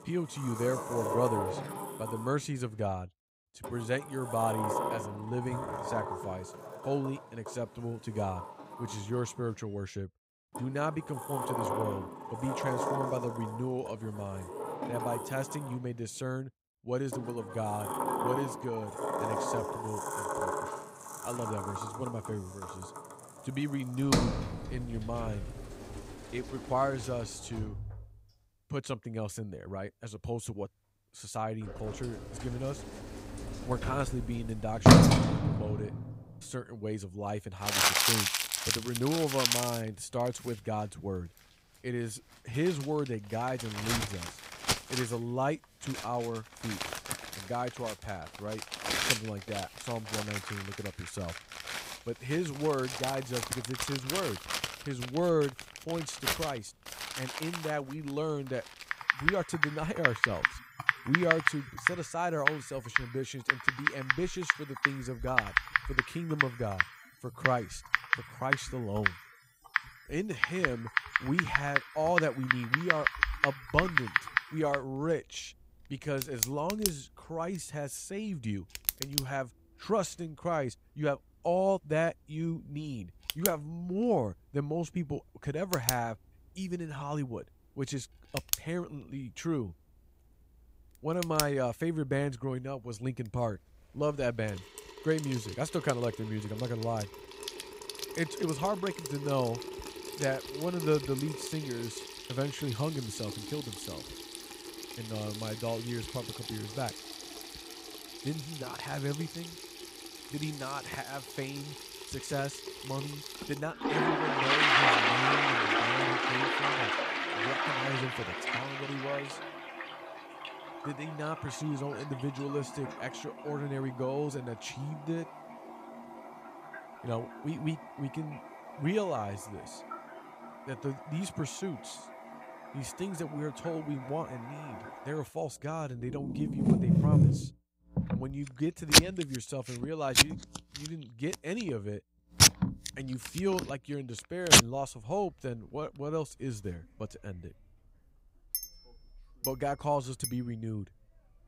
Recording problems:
household noises; very loud; throughout; 5 dB above the speech

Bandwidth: 15.5 kHz